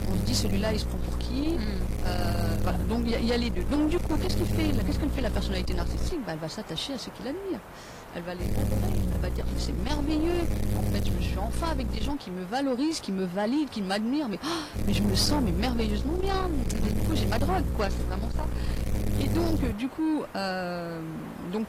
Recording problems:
distortion; slight; 10 dB below the speech
garbled, watery; slightly; nothing above 16 kHz
electrical hum; loud; until 6 s, from 8.5 to 12 s and from 15 to 20 s; 60 Hz, 7 dB below the speech
hiss; noticeable; throughout; 15 dB below the speech

